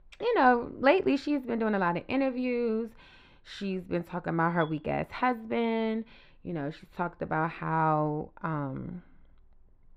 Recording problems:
muffled; very; fading above 3.5 kHz

